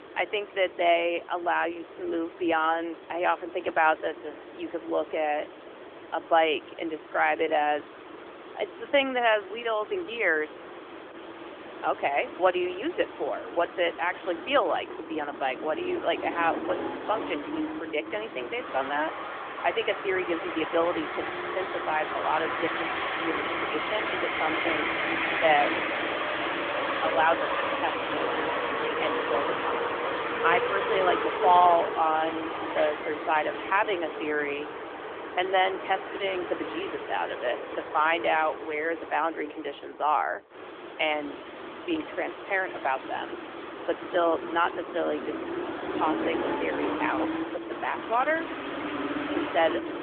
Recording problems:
phone-call audio; nothing above 3 kHz
traffic noise; loud; throughout; 4 dB below the speech

